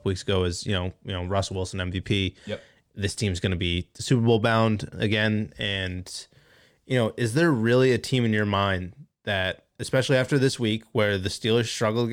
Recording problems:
abrupt cut into speech; at the end

